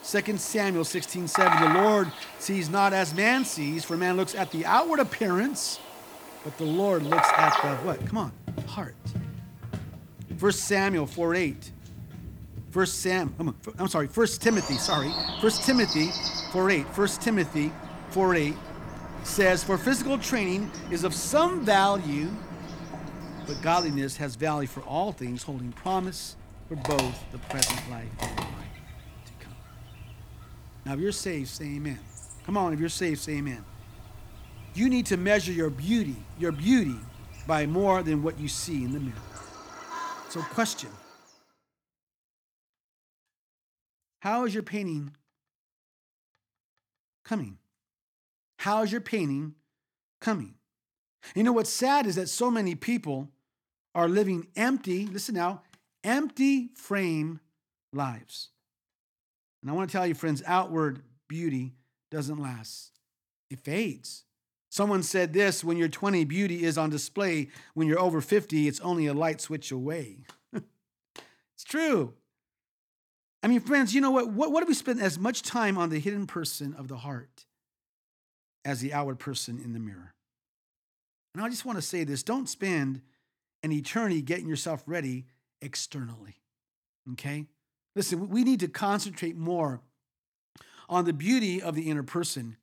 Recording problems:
animal sounds; loud; until 41 s; 5 dB below the speech

